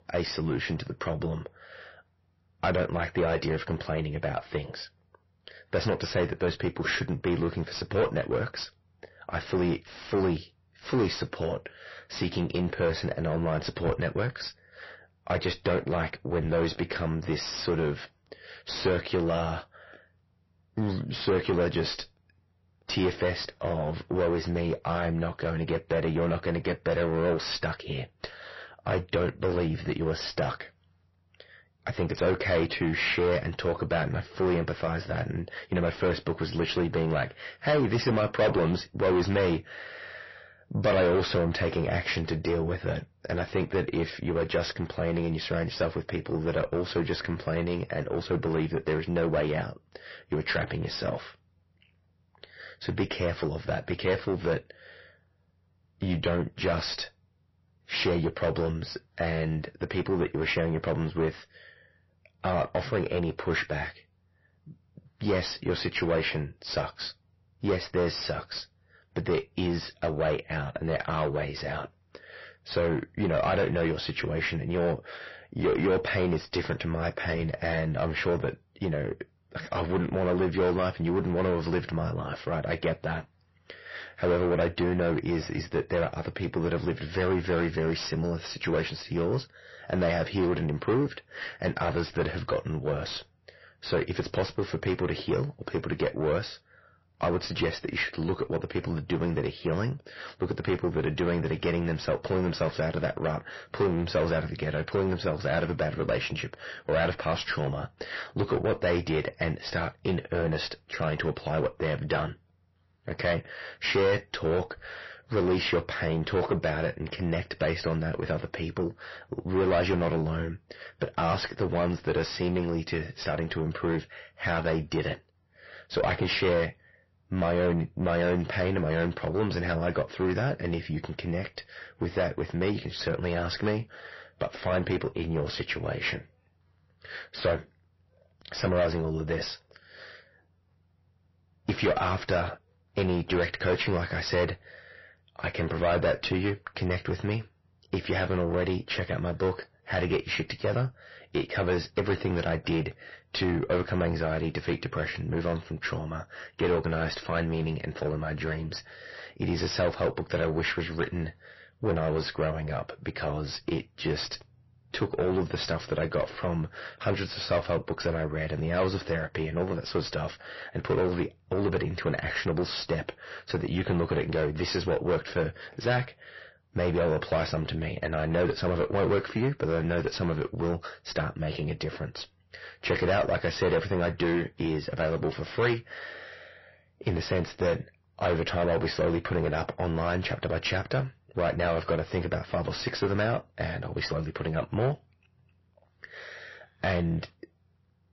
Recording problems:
distortion; heavy; 6 dB below the speech
garbled, watery; slightly; nothing above 5.5 kHz

